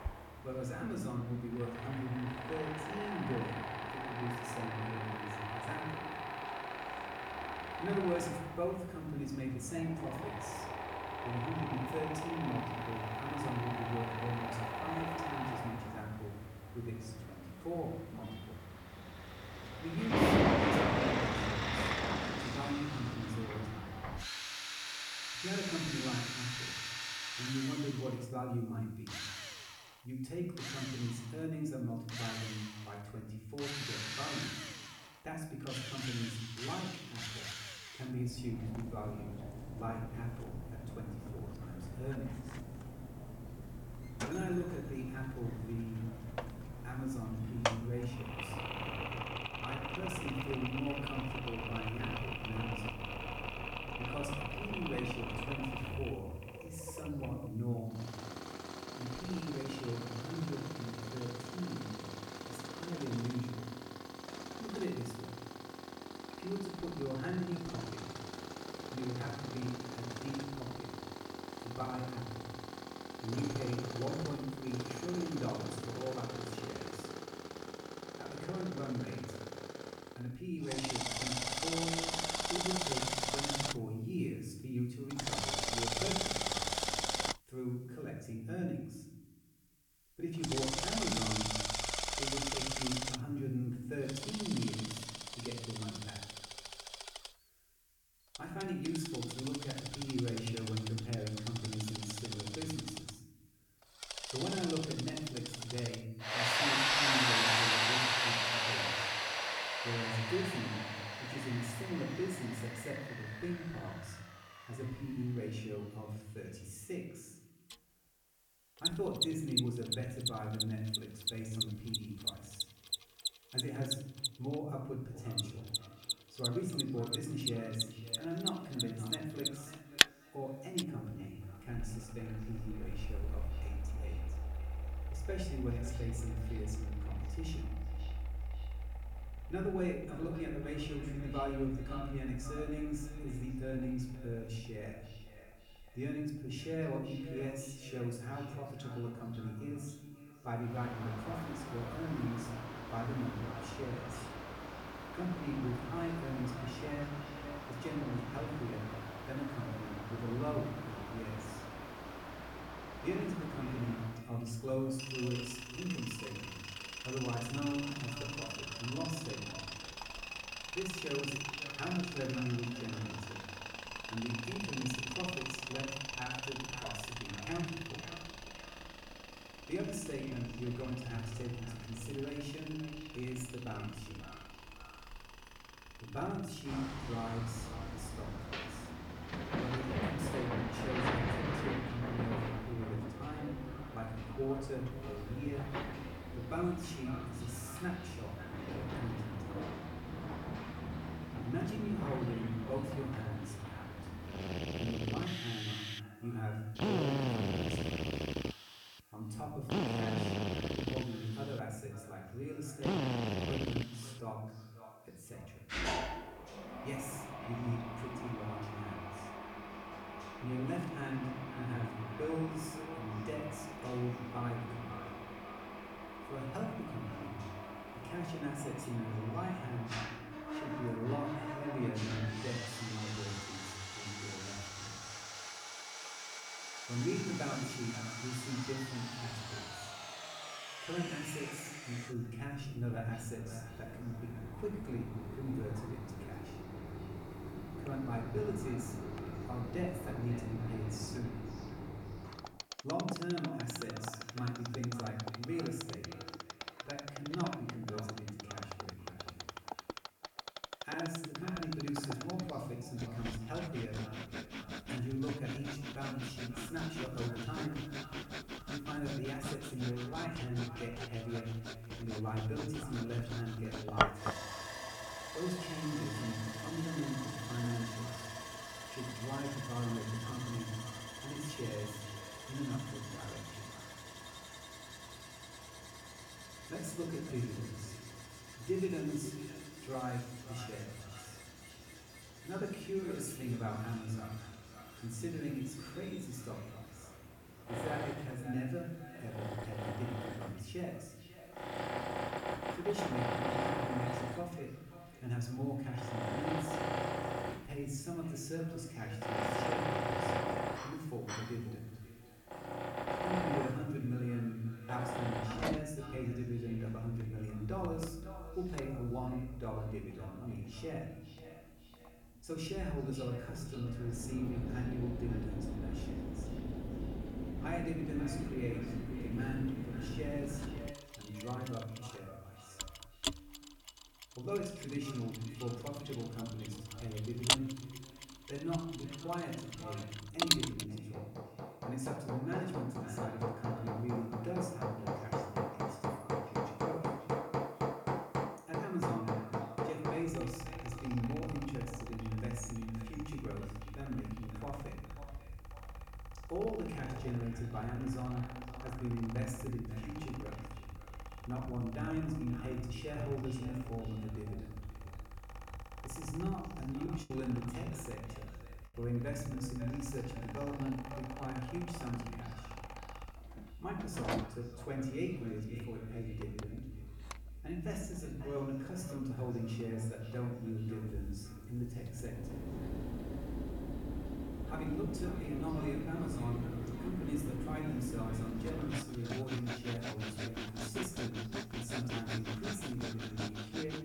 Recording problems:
off-mic speech; far
echo of what is said; noticeable; from 2:05 on; 540 ms later, 15 dB below the speech
room echo; slight; dies away in 0.9 s
machinery noise; very loud; throughout; as loud as the speech
hiss; faint; throughout; 25 dB below the speech
choppy; very; at 6:07; 5% of the speech affected

